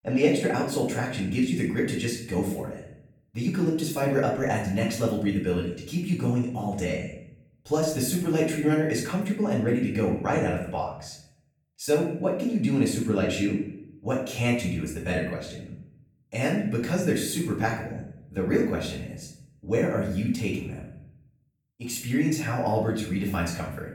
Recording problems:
off-mic speech; far
room echo; noticeable; dies away in 0.6 s

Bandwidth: 18 kHz